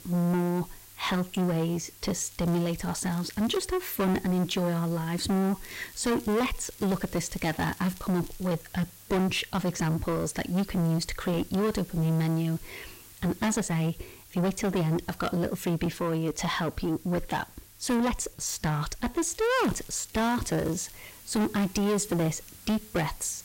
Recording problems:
distortion; heavy; 6 dB below the speech
hiss; noticeable; throughout; 20 dB below the speech
crackling; faint; from 2 to 3.5 s, from 5.5 to 8.5 s and from 19 to 21 s; 20 dB below the speech
uneven, jittery; slightly; from 6 to 22 s

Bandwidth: 16 kHz